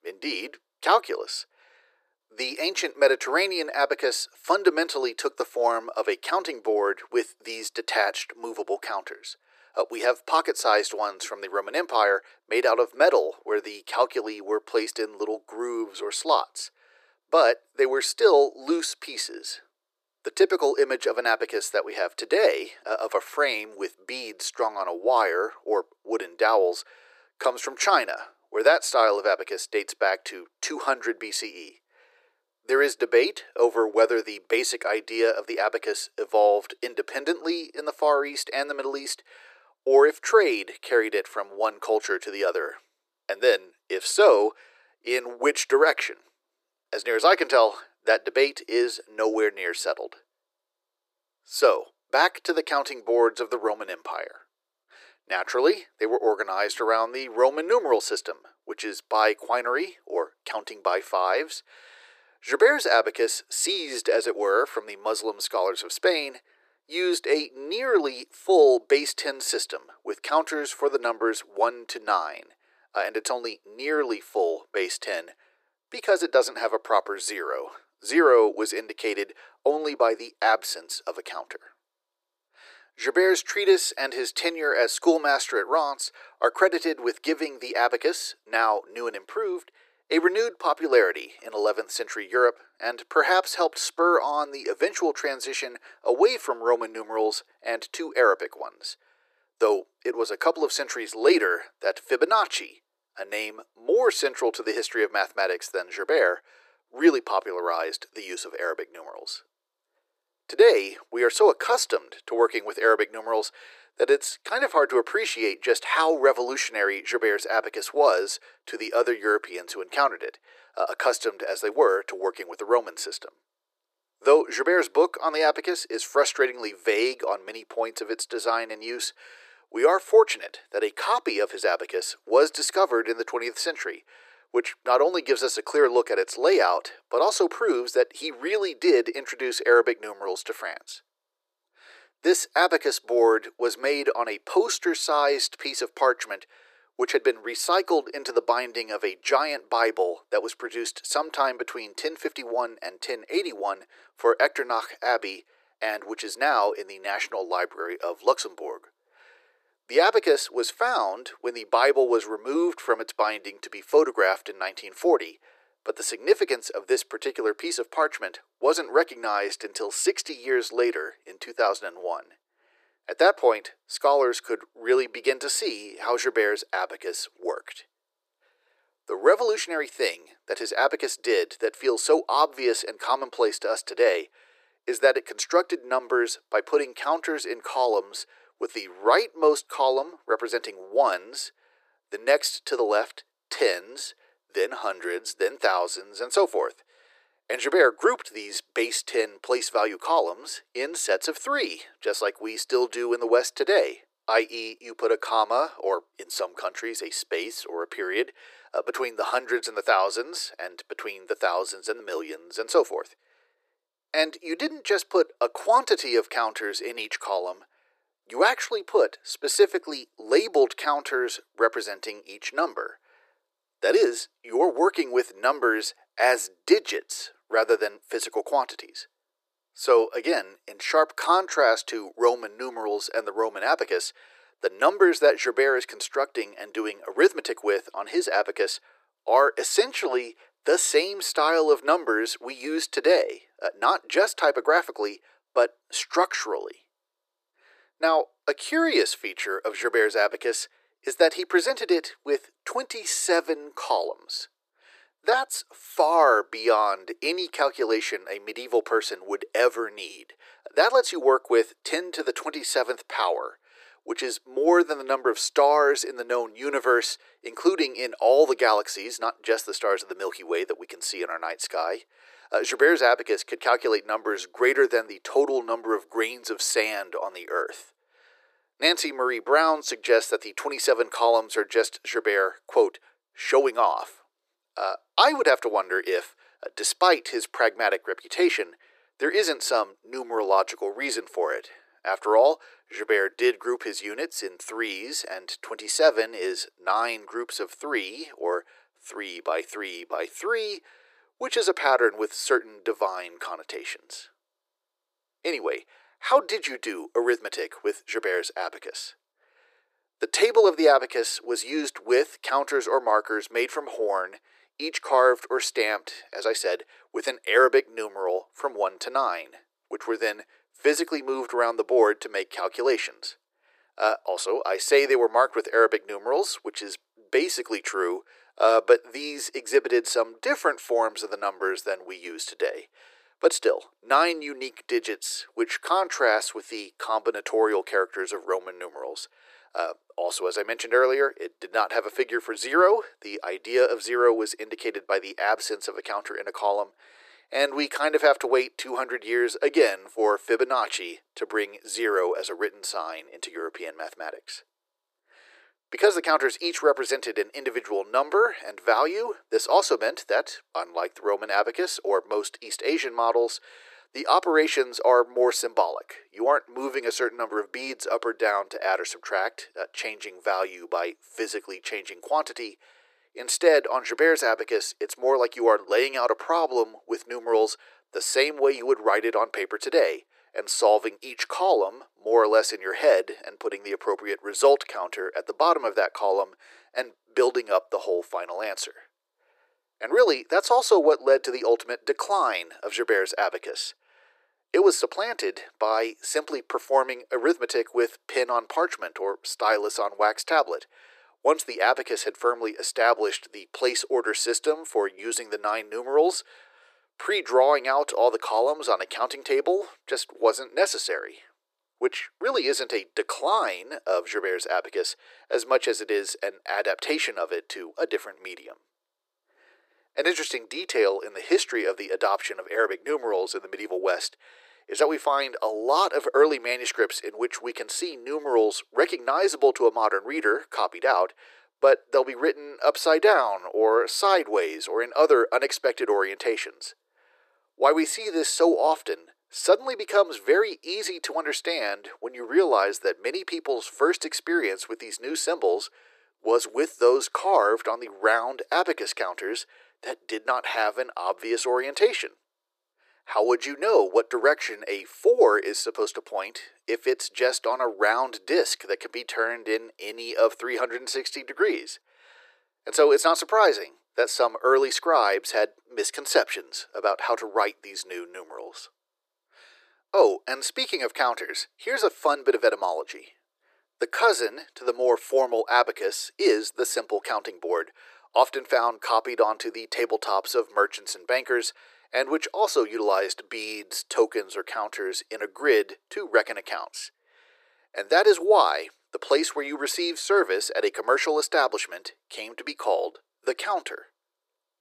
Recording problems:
thin; very; fading below 350 Hz

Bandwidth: 14.5 kHz